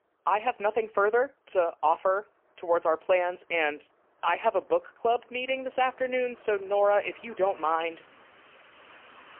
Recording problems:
phone-call audio; poor line; nothing above 3 kHz
traffic noise; faint; throughout; 25 dB below the speech

